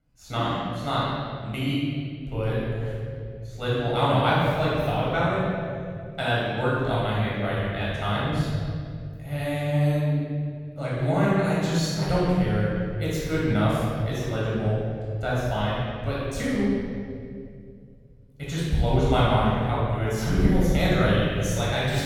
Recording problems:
room echo; strong; dies away in 2.8 s
off-mic speech; far

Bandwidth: 17.5 kHz